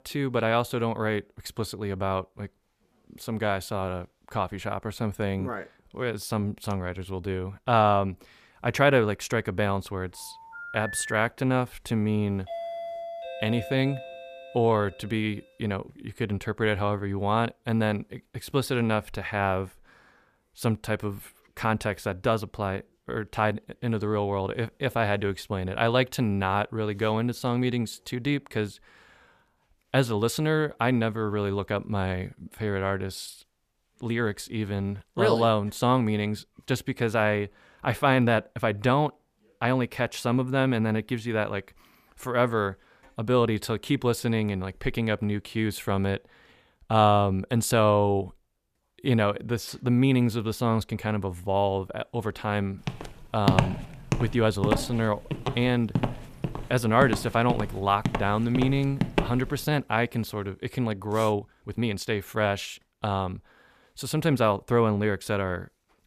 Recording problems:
phone ringing; noticeable; from 10 to 11 s; peak 8 dB below the speech
doorbell; noticeable; from 12 to 15 s; peak 7 dB below the speech
uneven, jittery; strongly; from 14 s to 1:02
footsteps; loud; from 53 to 59 s; peak 3 dB above the speech

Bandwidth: 14.5 kHz